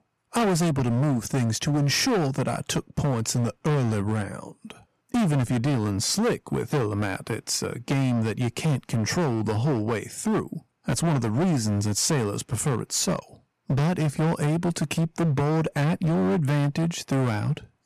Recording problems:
distortion; heavy; 21% of the sound clipped

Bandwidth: 14 kHz